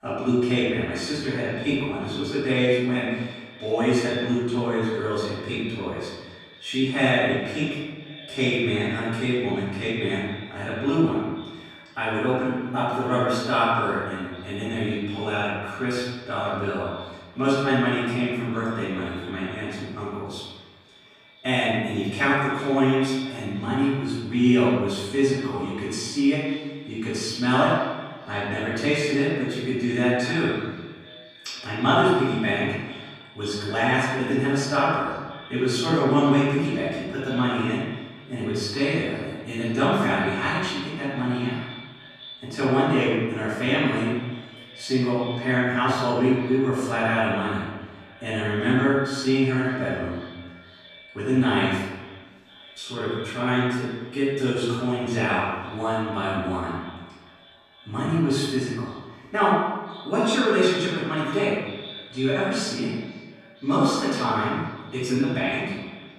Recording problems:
room echo; strong; dies away in 1.1 s
off-mic speech; far
echo of what is said; faint; throughout; 510 ms later, 20 dB below the speech

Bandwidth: 14.5 kHz